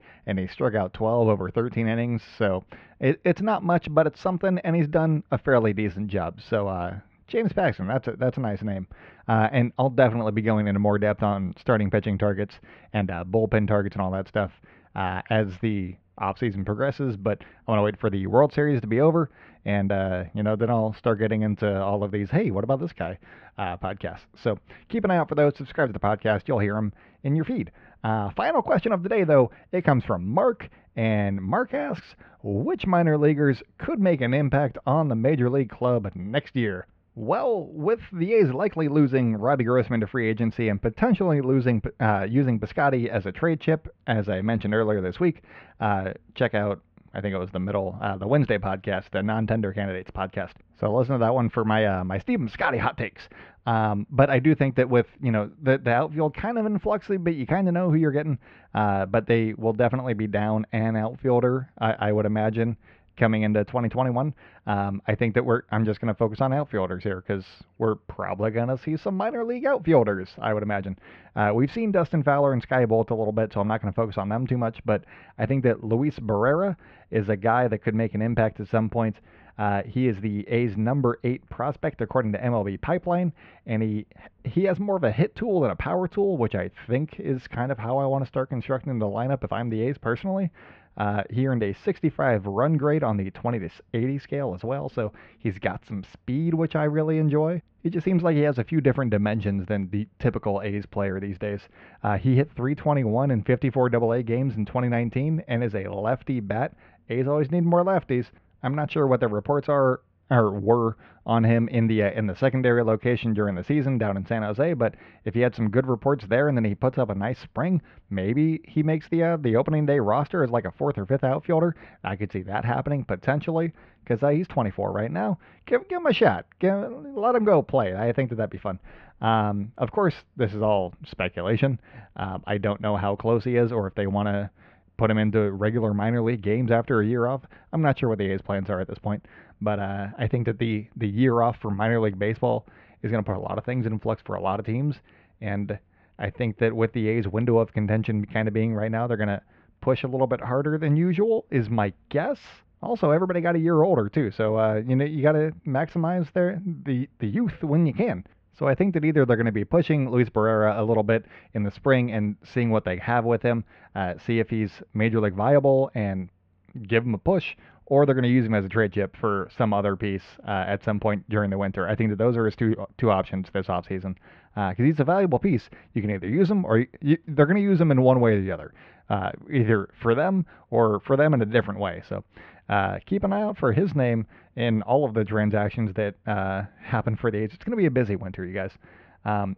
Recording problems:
muffled; very; fading above 3 kHz

